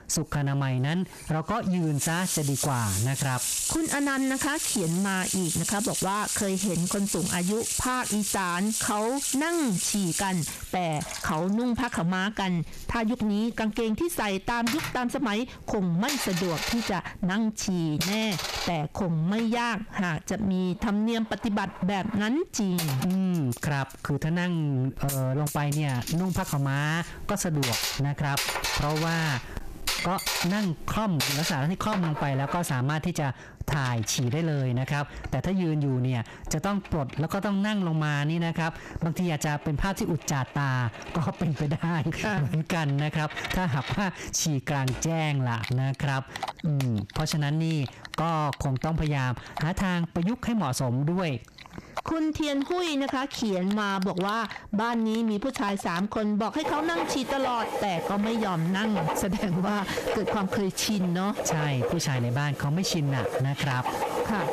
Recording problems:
squashed, flat; heavily, background pumping
distortion; slight; 17% of the sound clipped
household noises; loud; throughout; 5 dB below the speech

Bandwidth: 14.5 kHz